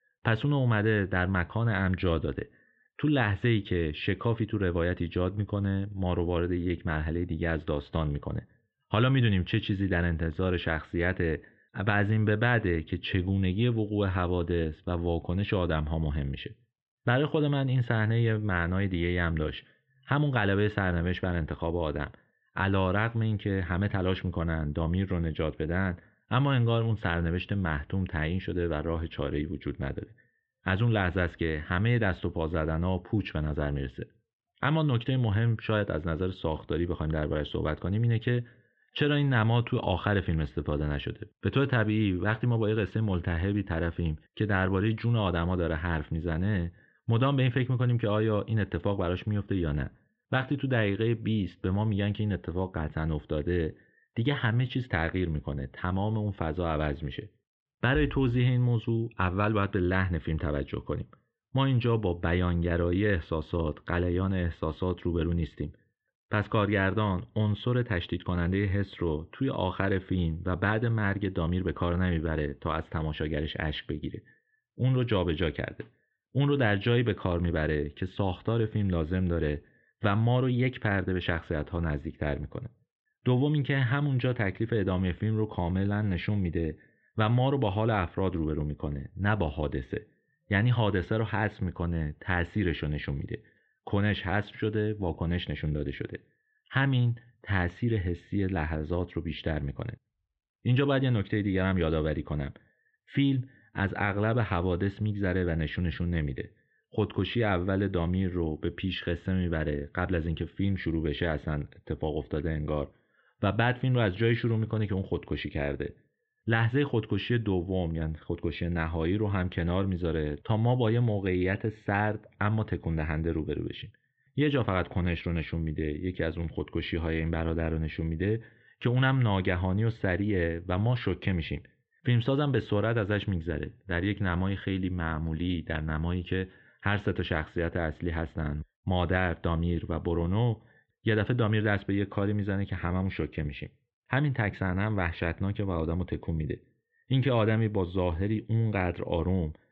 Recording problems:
muffled; very; fading above 3 kHz

